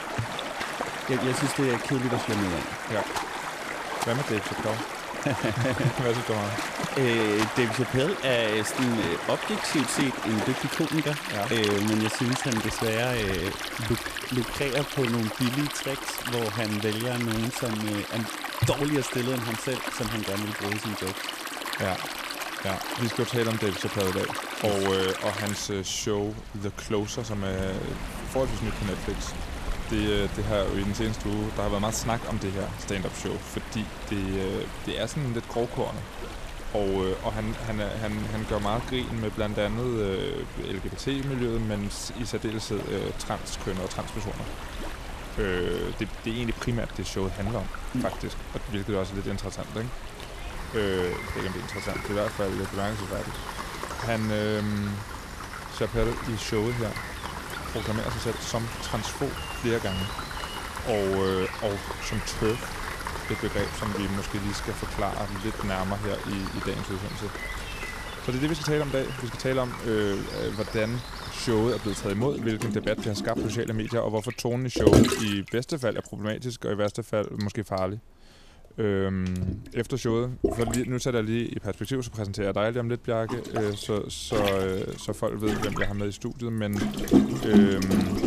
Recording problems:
rain or running water; loud; throughout; 3 dB below the speech

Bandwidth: 14.5 kHz